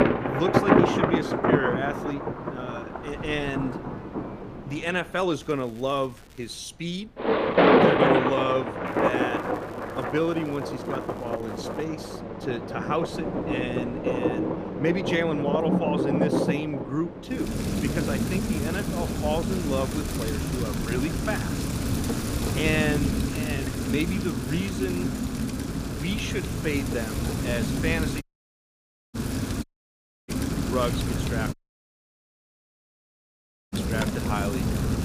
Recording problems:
rain or running water; very loud; throughout; 3 dB above the speech
wind noise on the microphone; occasional gusts; 25 dB below the speech
crackling; faint; from 5.5 to 6.5 s and from 9 to 12 s; 25 dB below the speech
audio cutting out; at 28 s for 1 s, at 30 s for 0.5 s and at 32 s for 2 s

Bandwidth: 15 kHz